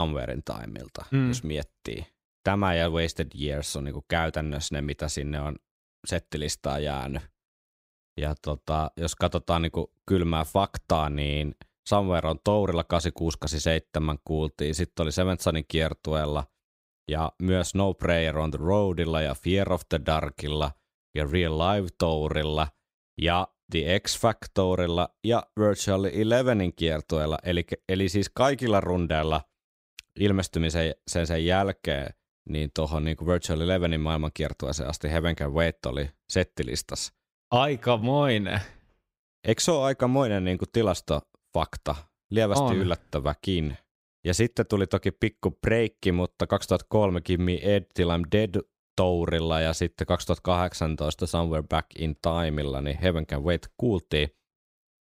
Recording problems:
abrupt cut into speech; at the start

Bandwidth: 15.5 kHz